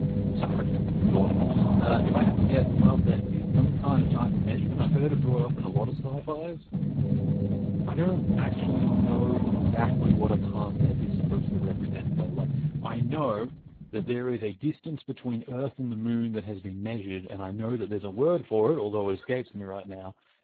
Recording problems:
garbled, watery; badly; nothing above 4 kHz
low rumble; loud; until 14 s; as loud as the speech

